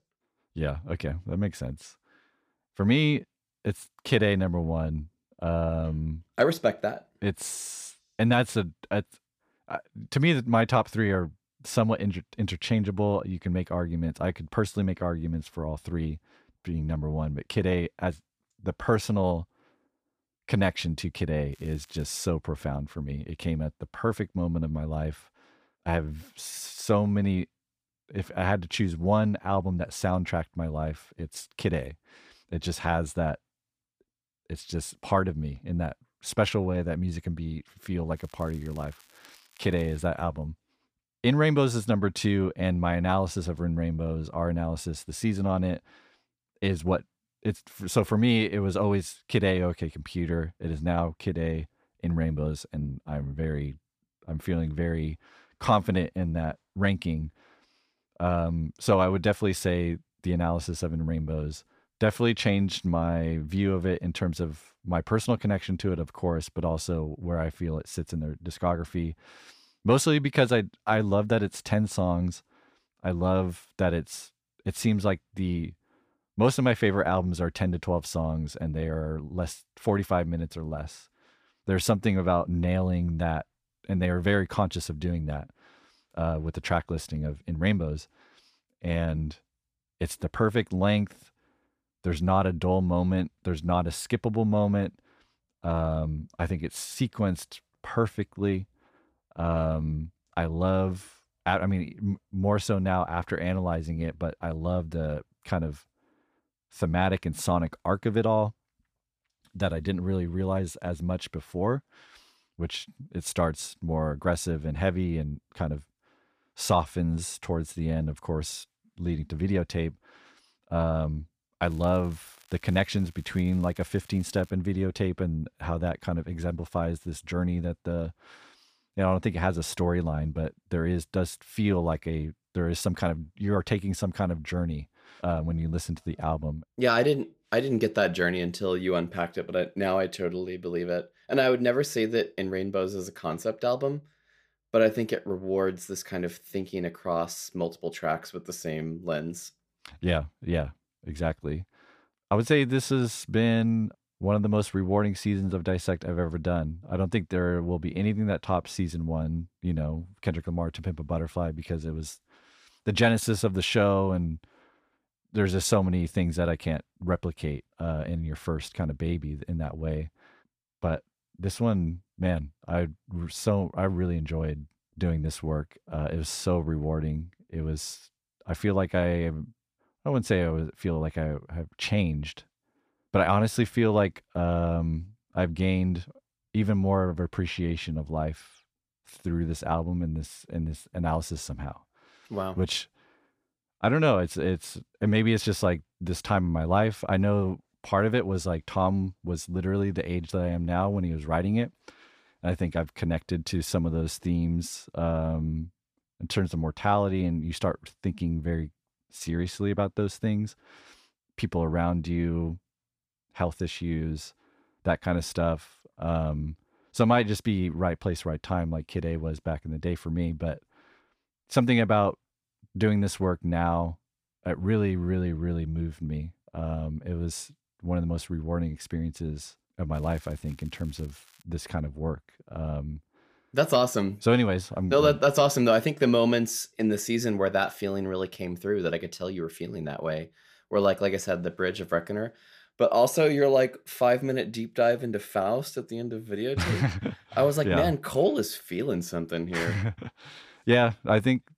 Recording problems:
crackling; faint; 4 times, first at 22 s; 30 dB below the speech

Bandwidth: 15 kHz